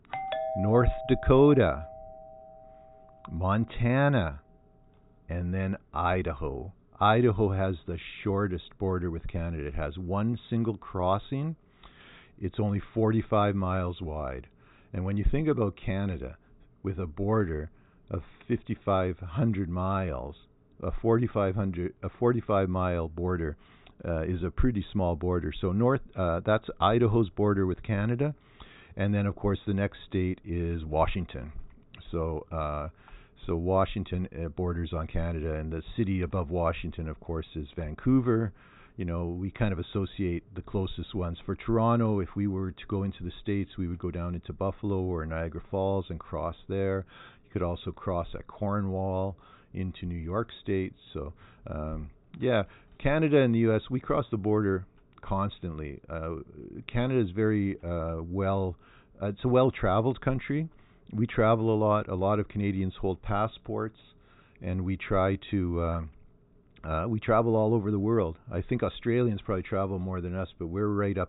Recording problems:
high frequencies cut off; severe; nothing above 4 kHz
doorbell; noticeable; until 2.5 s; peak 3 dB below the speech

